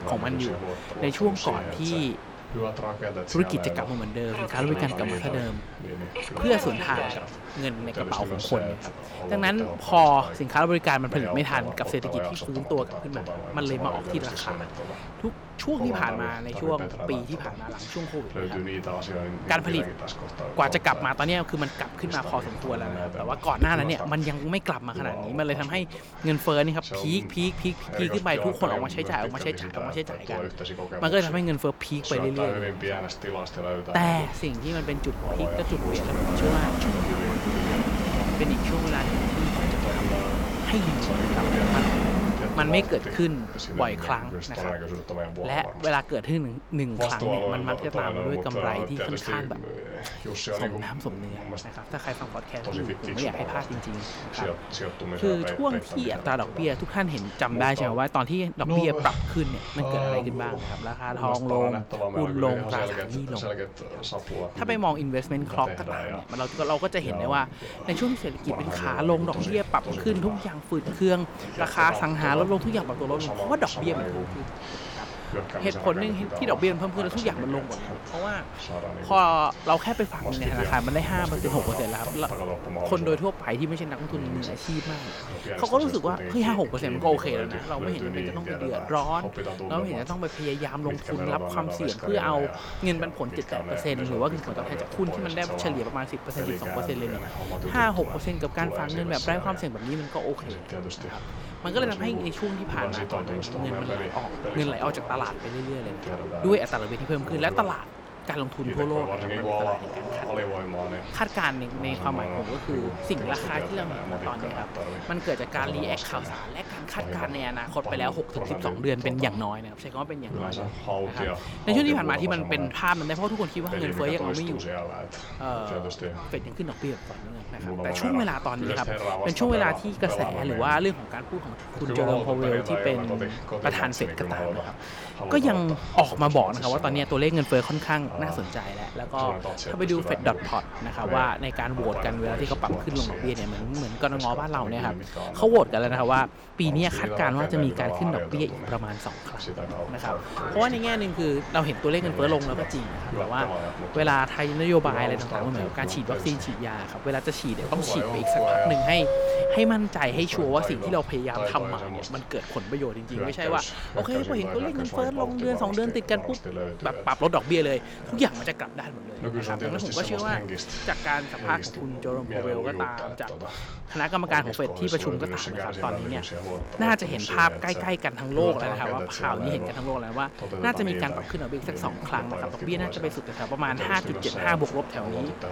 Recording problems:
train or aircraft noise; loud; throughout; 8 dB below the speech
voice in the background; loud; throughout; 6 dB below the speech

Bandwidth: 18.5 kHz